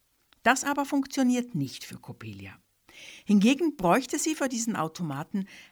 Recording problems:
none

